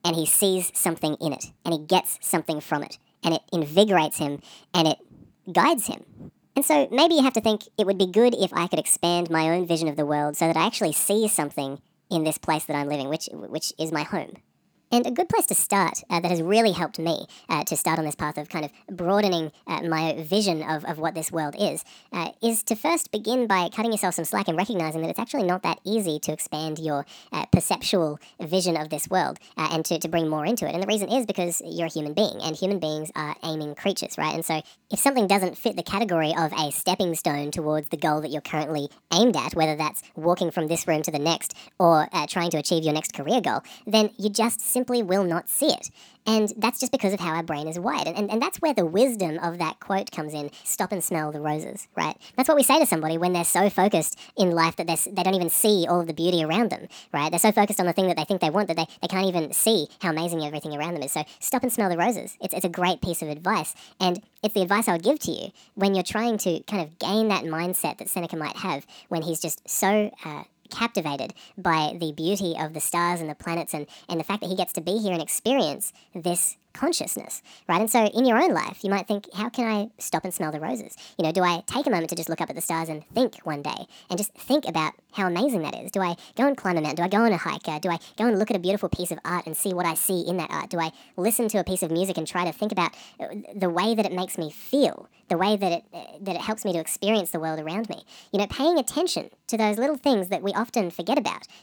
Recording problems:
wrong speed and pitch; too fast and too high; 1.5 times normal speed

